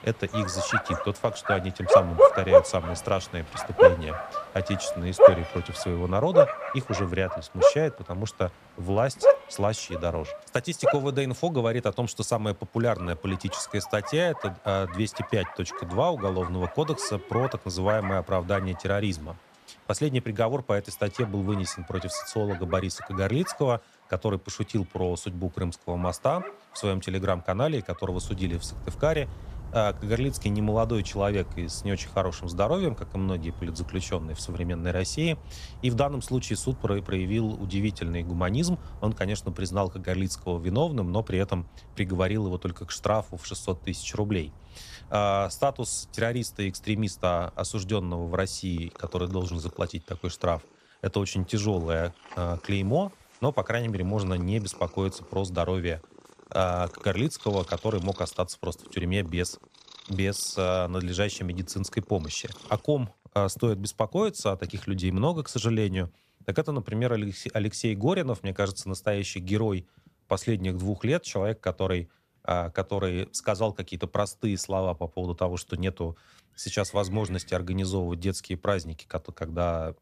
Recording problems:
animal sounds; very loud; throughout; 2 dB above the speech

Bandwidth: 14.5 kHz